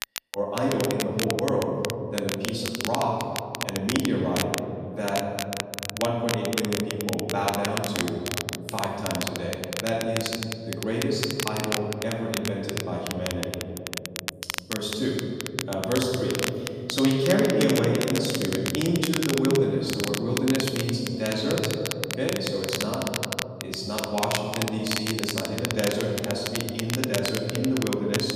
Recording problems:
off-mic speech; far
room echo; noticeable; dies away in 2.6 s
crackle, like an old record; loud; 5 dB below the speech

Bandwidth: 14.5 kHz